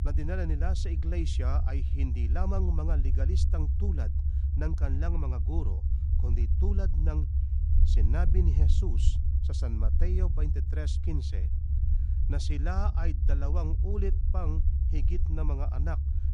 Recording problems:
low rumble; loud; throughout; 5 dB below the speech

